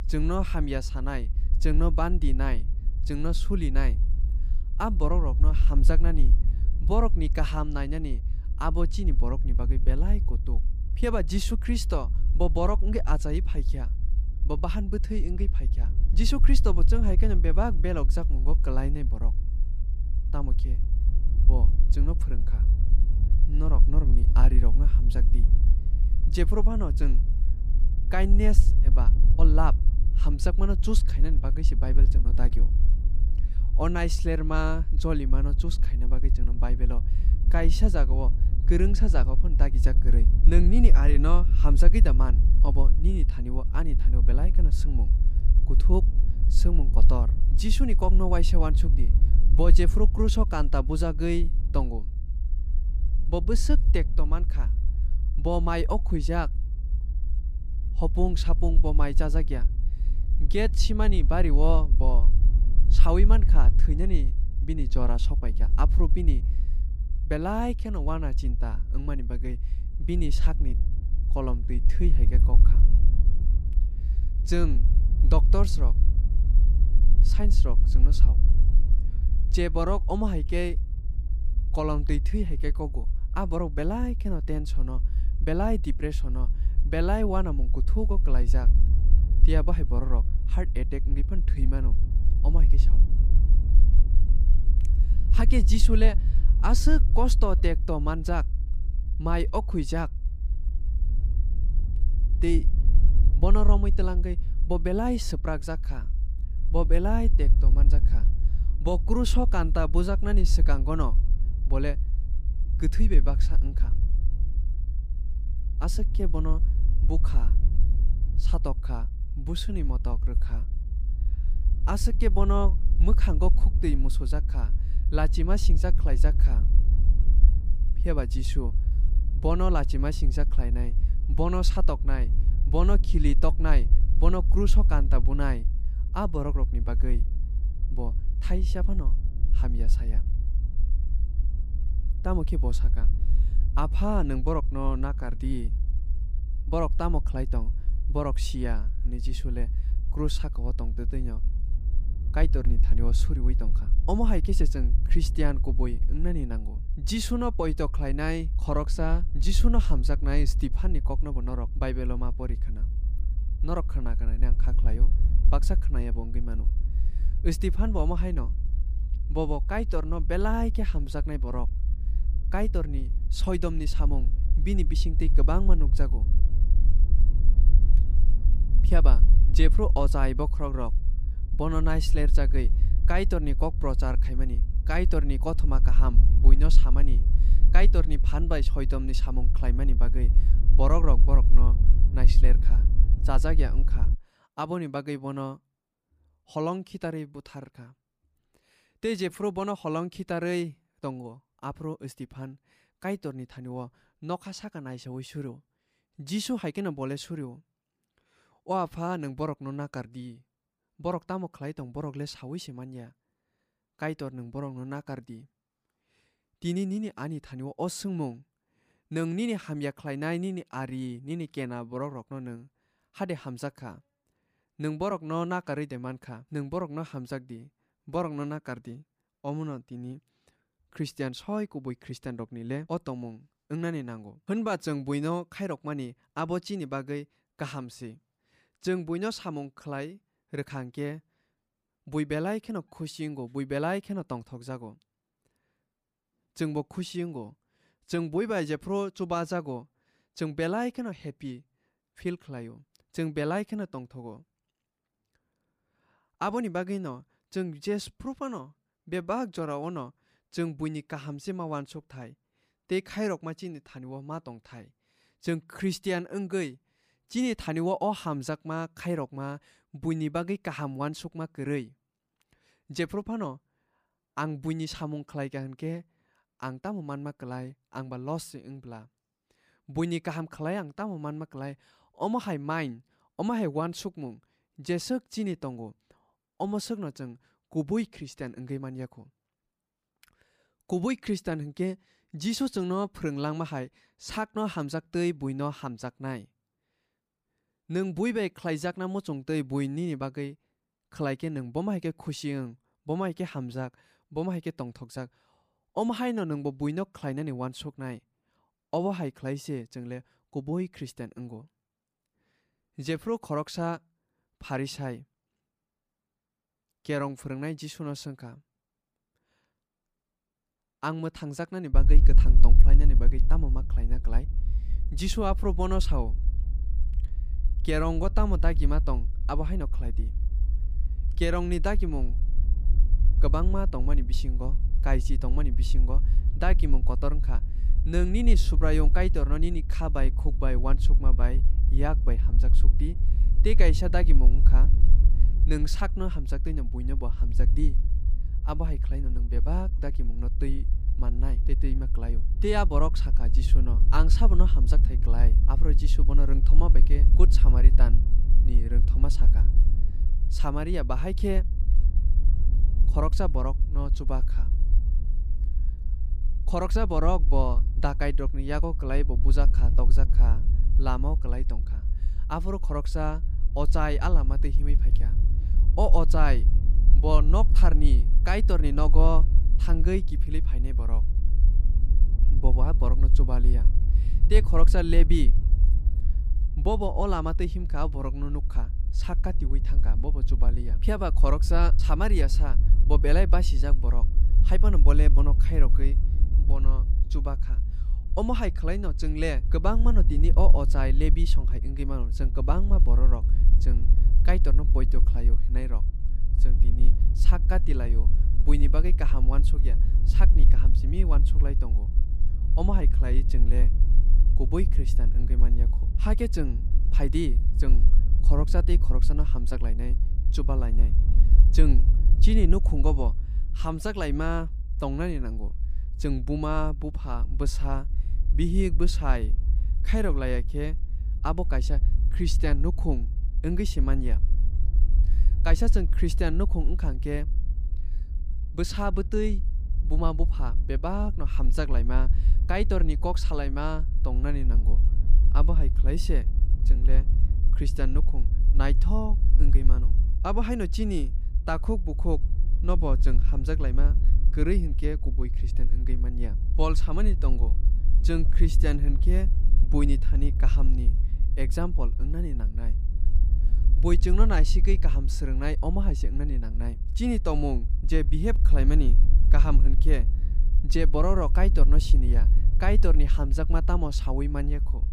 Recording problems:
low rumble; noticeable; until 3:14 and from 5:22 on; 15 dB below the speech

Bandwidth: 15 kHz